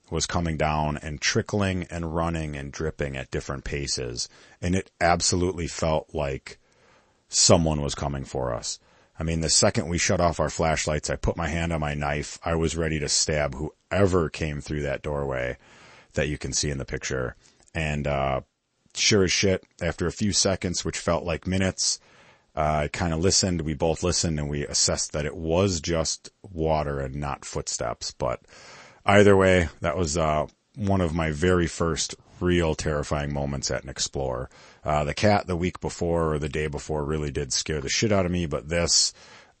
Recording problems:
garbled, watery; slightly; nothing above 8 kHz

